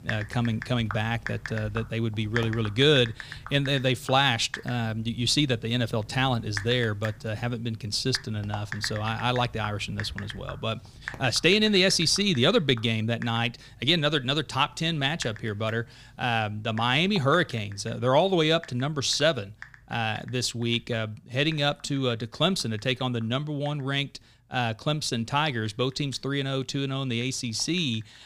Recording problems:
household noises; noticeable; throughout; 15 dB below the speech

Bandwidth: 15 kHz